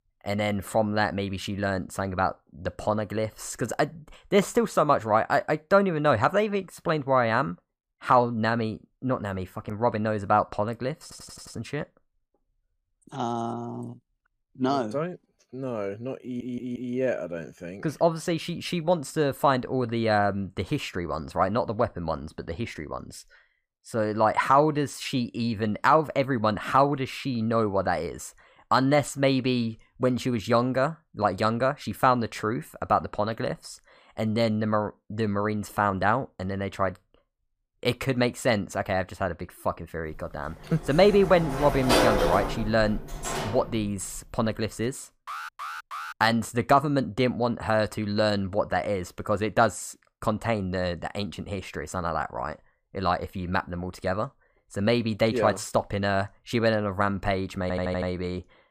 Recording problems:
audio stuttering; at 11 s, at 16 s and at 58 s
door banging; loud; from 40 to 44 s; peak 5 dB above the speech
alarm; noticeable; at 45 s; peak 9 dB below the speech

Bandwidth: 15 kHz